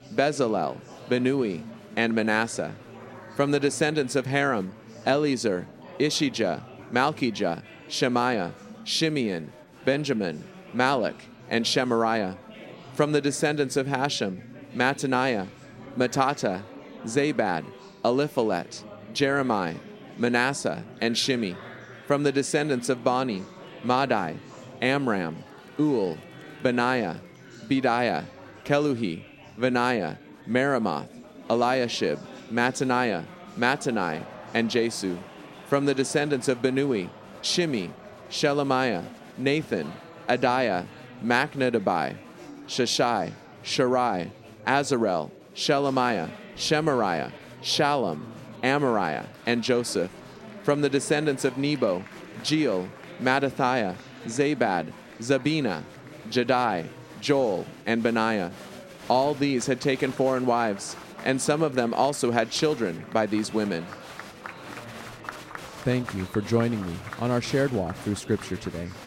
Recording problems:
murmuring crowd; noticeable; throughout; 20 dB below the speech

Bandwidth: 16 kHz